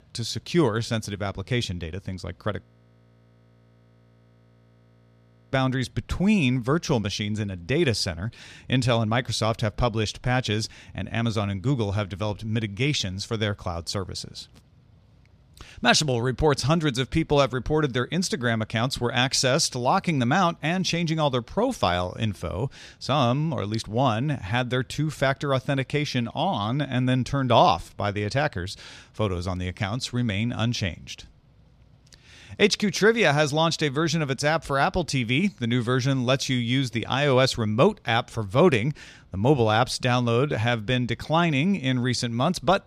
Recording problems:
audio freezing; at 2.5 s for 3 s

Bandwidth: 14 kHz